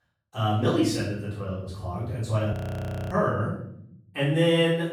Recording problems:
off-mic speech; far
room echo; noticeable; dies away in 0.7 s
audio freezing; at 2.5 s for 0.5 s

